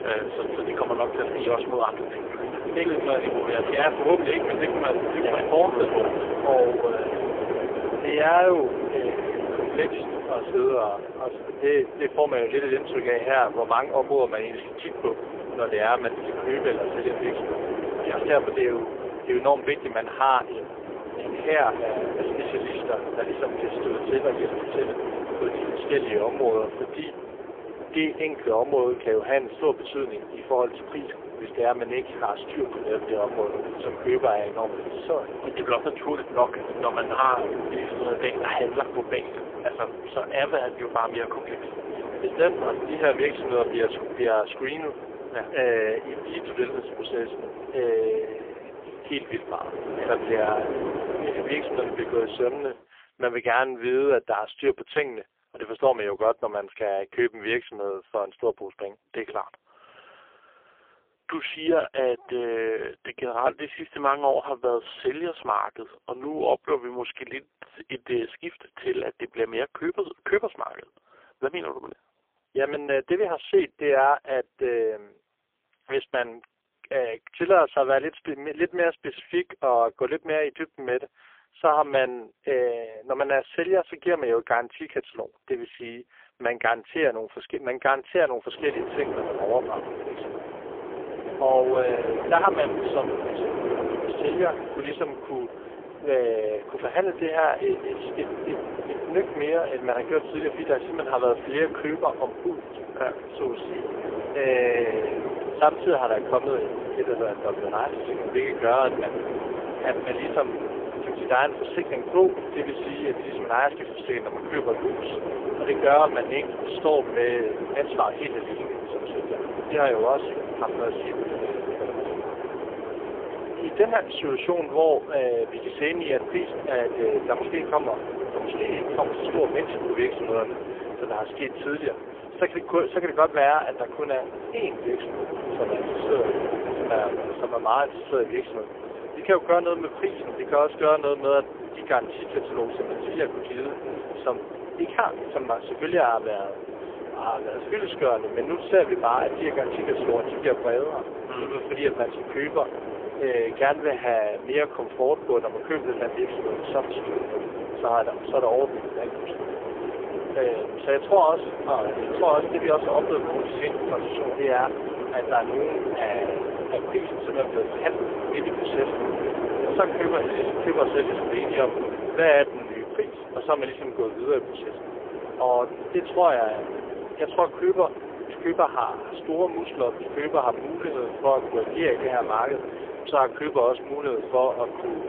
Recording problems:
phone-call audio; poor line; nothing above 3.5 kHz
wind noise on the microphone; heavy; until 53 s and from 1:29 on; 7 dB below the speech

